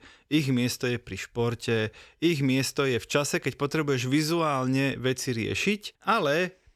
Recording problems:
none

